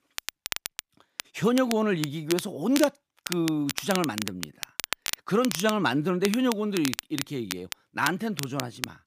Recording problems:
crackle, like an old record; loud; 8 dB below the speech

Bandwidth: 15 kHz